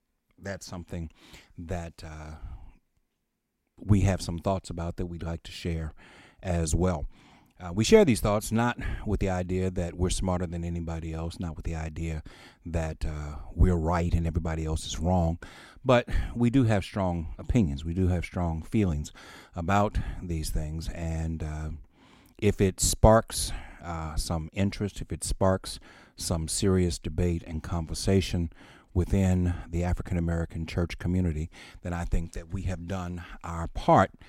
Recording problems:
none

